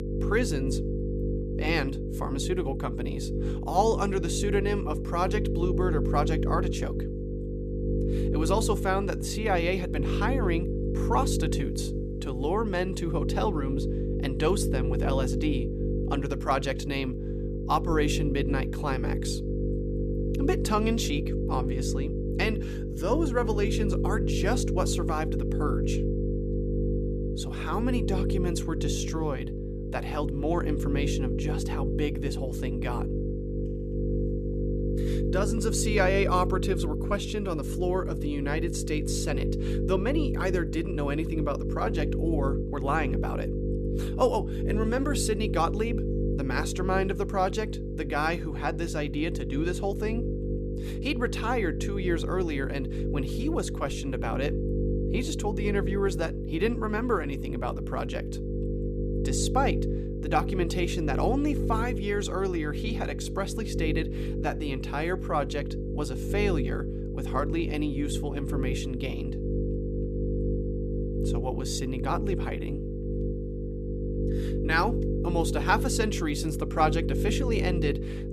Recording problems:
electrical hum; loud; throughout; 50 Hz, 6 dB below the speech

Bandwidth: 14.5 kHz